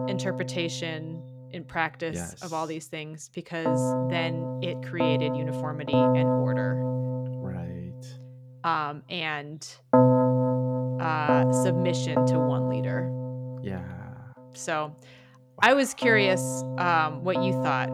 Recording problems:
background music; very loud; throughout; 3 dB above the speech

